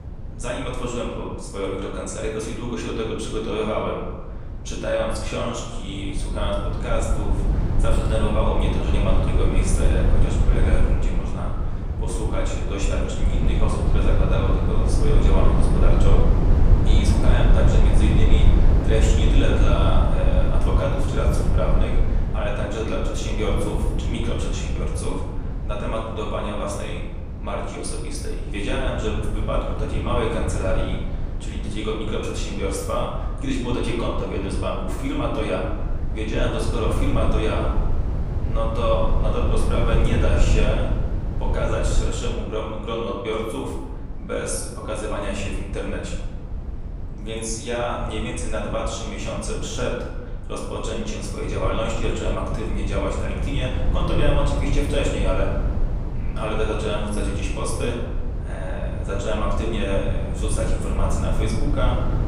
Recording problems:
off-mic speech; far
room echo; noticeable; dies away in 1 s
low rumble; loud; throughout; 8 dB below the speech

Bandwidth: 15 kHz